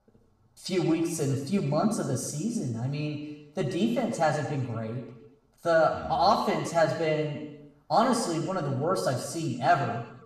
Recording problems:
room echo; noticeable; dies away in 1 s
off-mic speech; somewhat distant

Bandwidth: 14.5 kHz